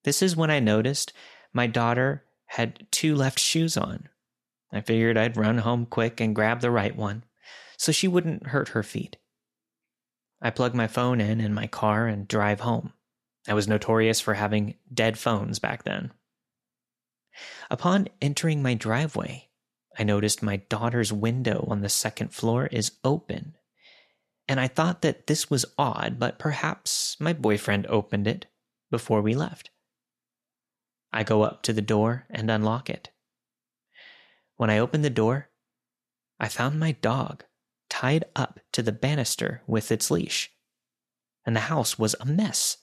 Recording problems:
none

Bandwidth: 13.5 kHz